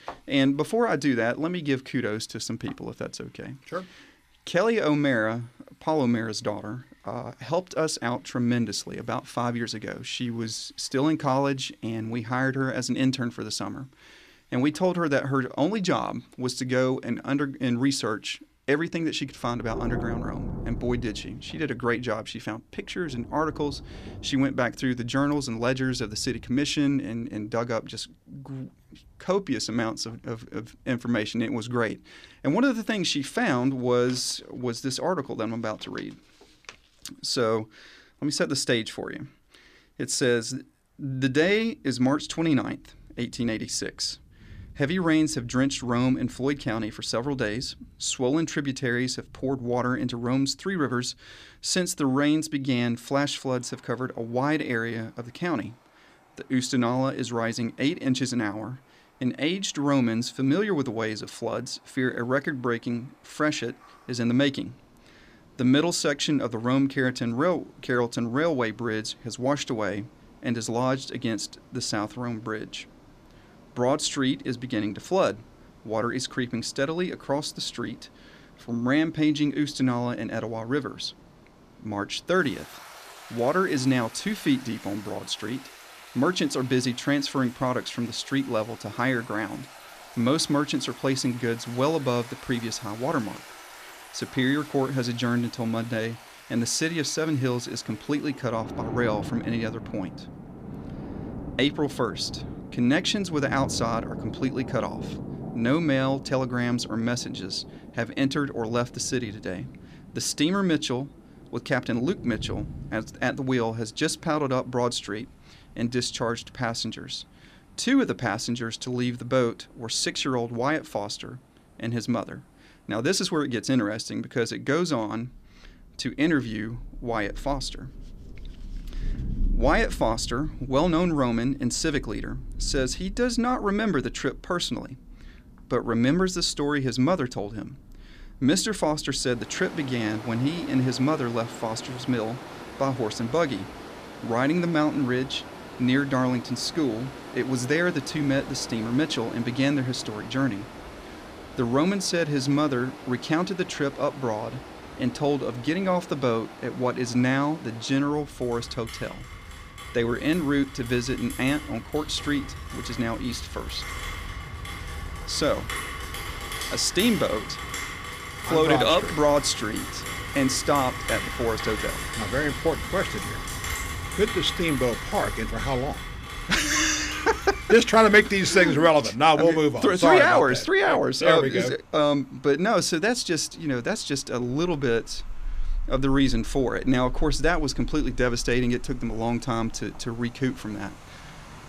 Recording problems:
rain or running water; noticeable; throughout; 10 dB below the speech

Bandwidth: 14.5 kHz